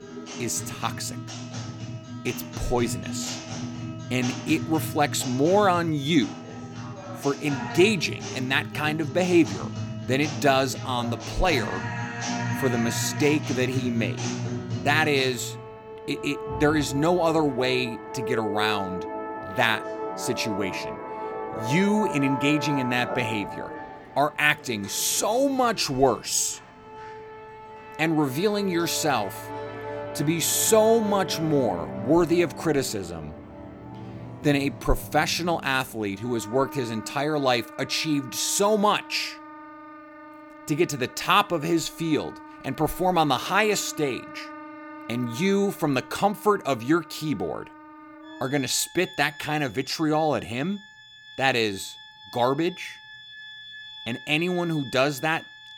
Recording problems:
background music; noticeable; throughout; 10 dB below the speech

